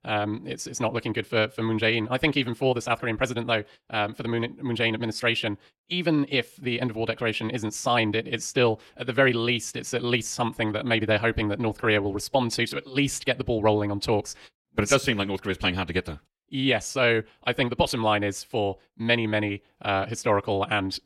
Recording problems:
wrong speed, natural pitch; too fast; 1.5 times normal speed

